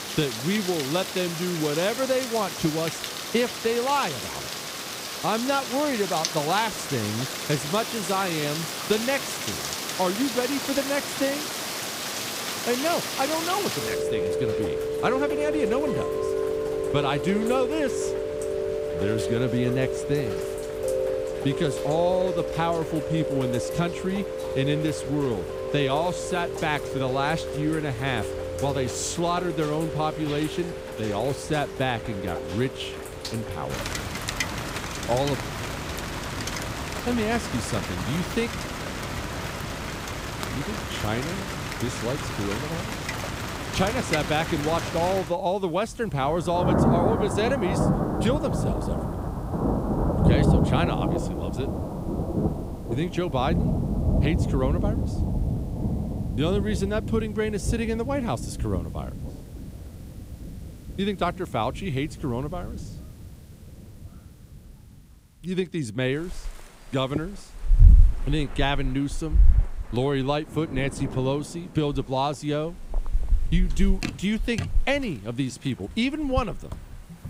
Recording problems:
rain or running water; loud; throughout; 1 dB below the speech

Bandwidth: 15.5 kHz